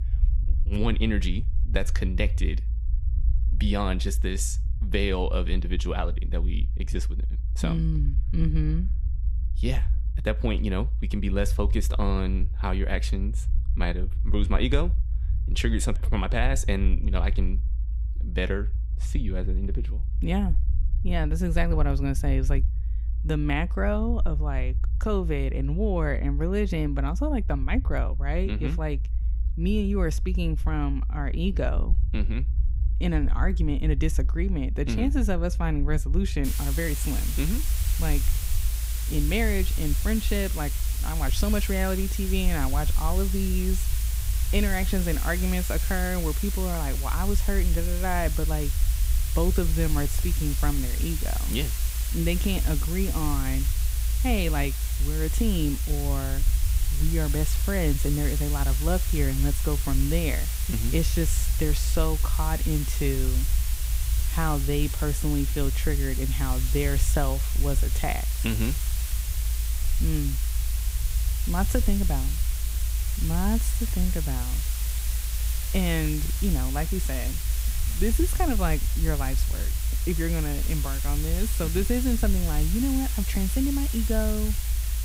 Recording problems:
hiss; loud; from 36 s on; 5 dB below the speech
low rumble; noticeable; throughout; 15 dB below the speech

